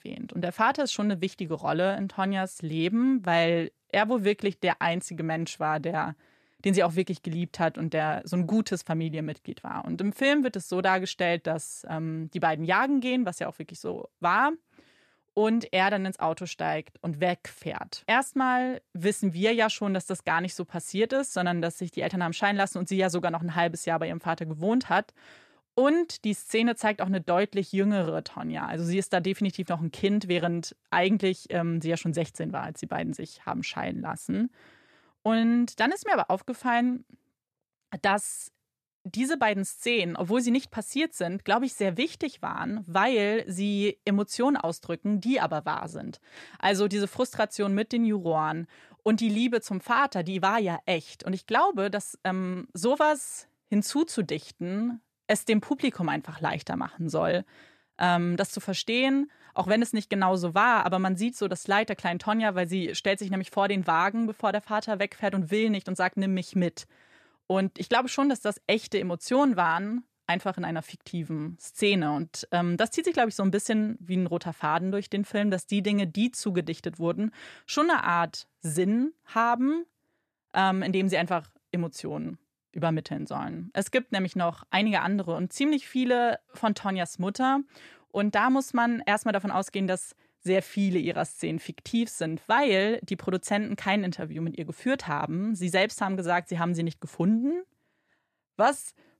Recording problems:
none

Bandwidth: 14 kHz